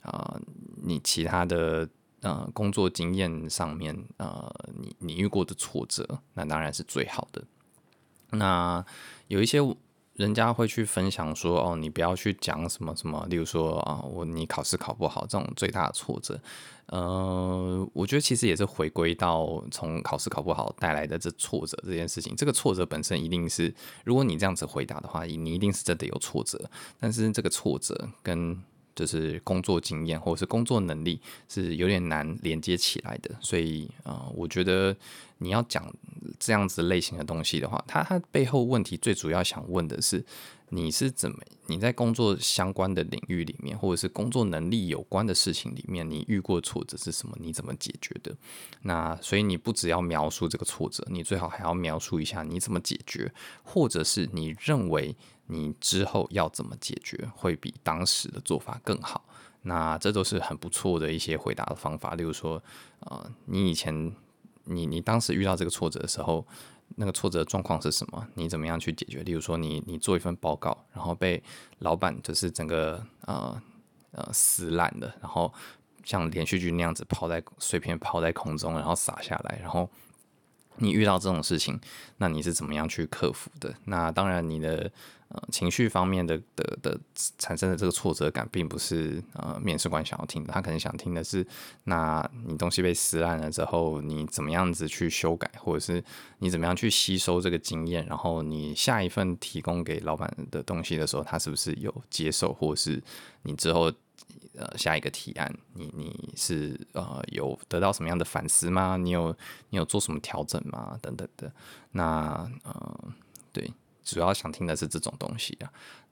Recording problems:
none

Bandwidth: 18.5 kHz